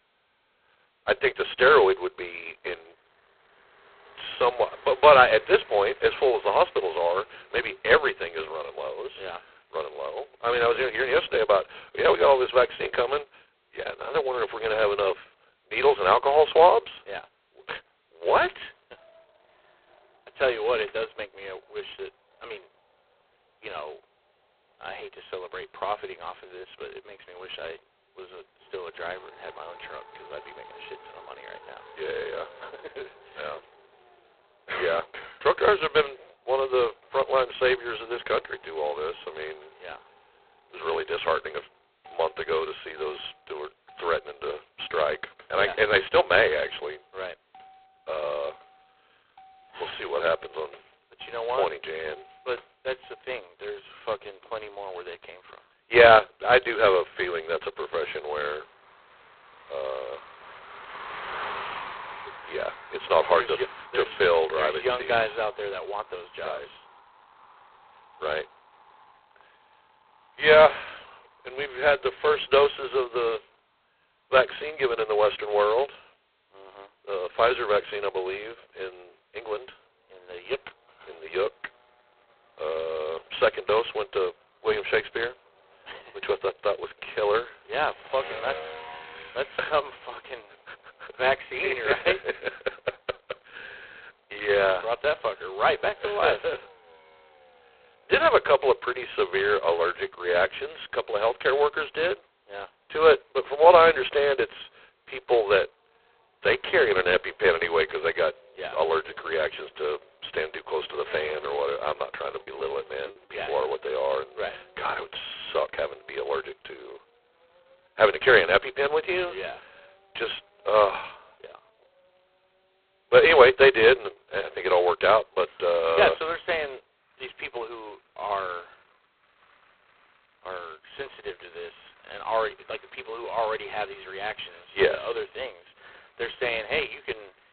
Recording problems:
phone-call audio; poor line; nothing above 4 kHz
traffic noise; faint; throughout; 25 dB below the speech
choppy; occasionally; from 1:52 to 1:54; 3% of the speech affected

